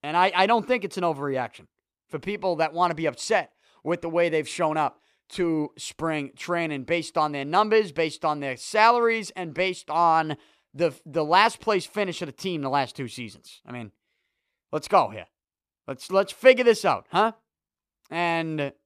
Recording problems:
none

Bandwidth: 14.5 kHz